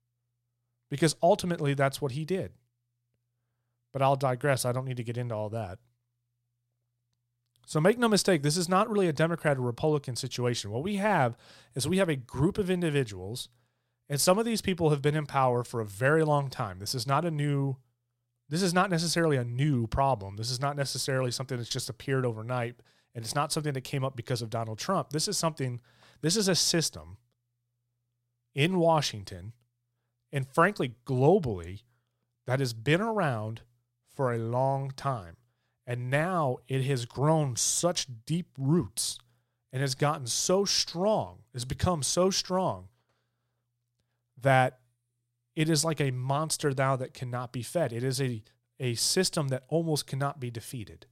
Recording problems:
none

